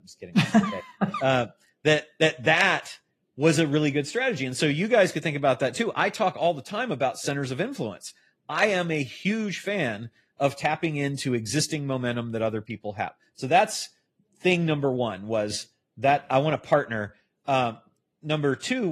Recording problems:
garbled, watery; slightly
abrupt cut into speech; at the end

